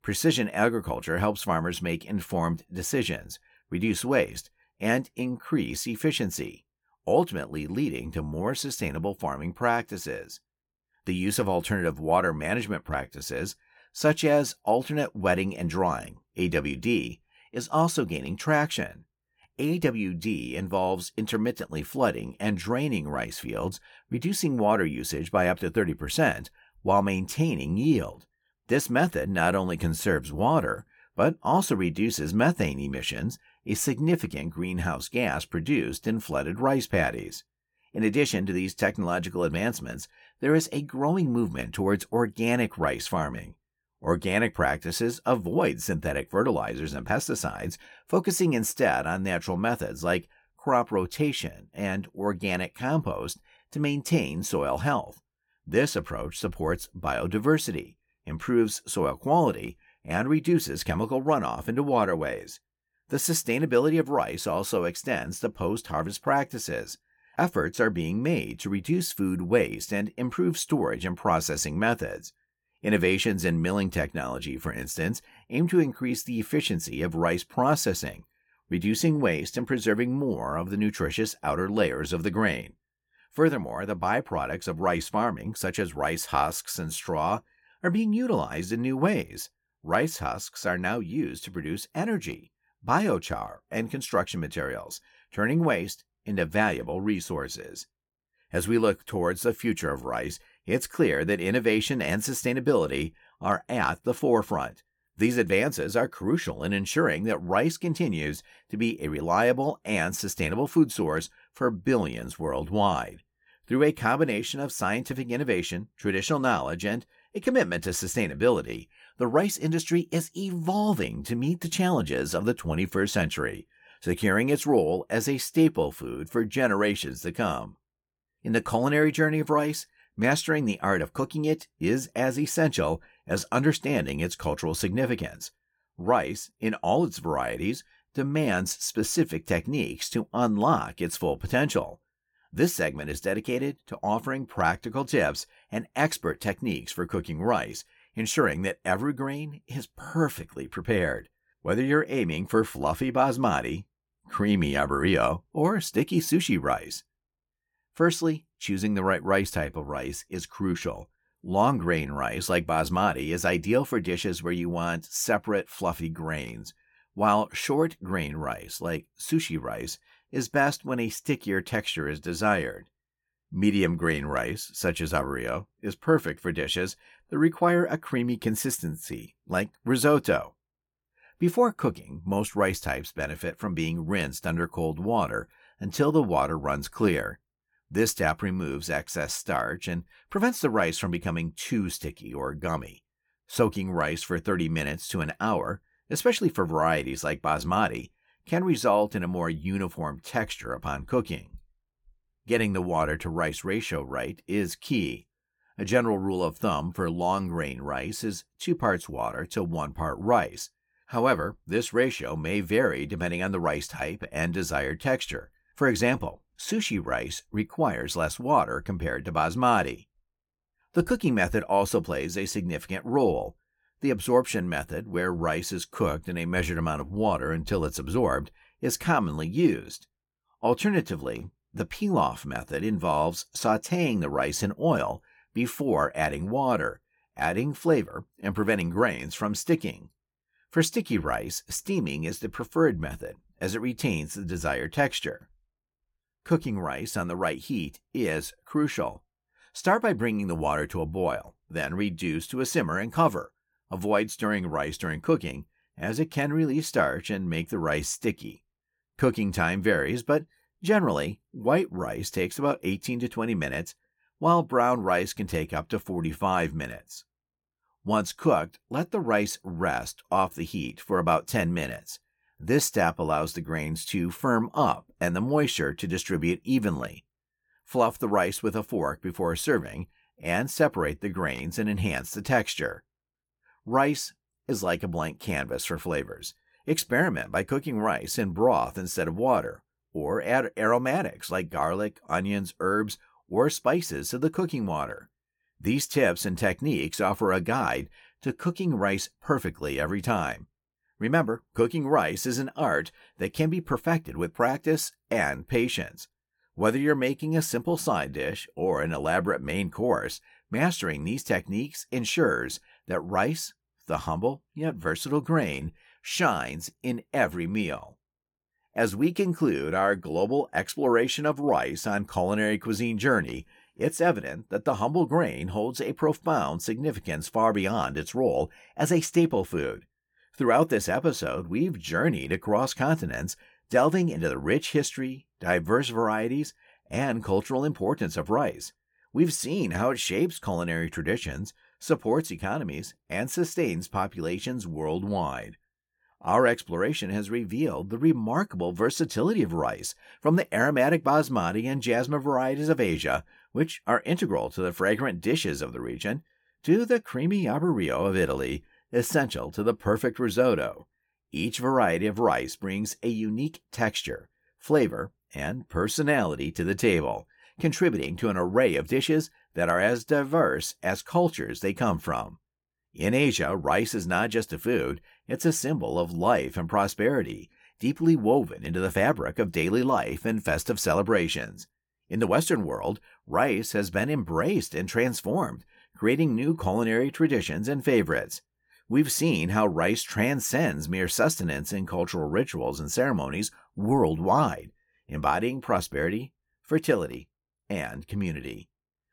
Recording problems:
none

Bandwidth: 17.5 kHz